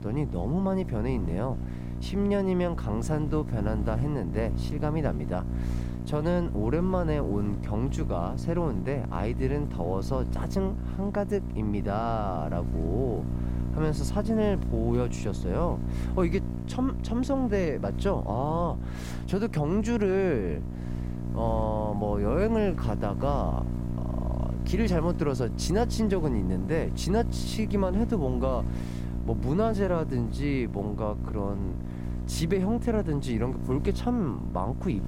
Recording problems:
electrical hum; noticeable; throughout; 60 Hz, 10 dB below the speech

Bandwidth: 16 kHz